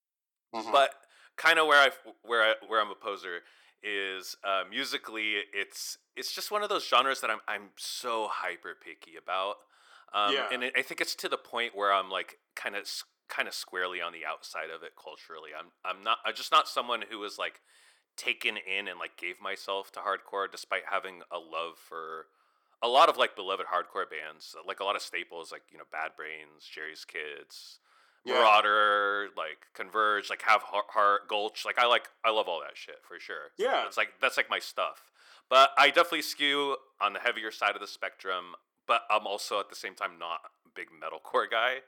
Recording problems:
thin; somewhat; fading below 400 Hz

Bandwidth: 18.5 kHz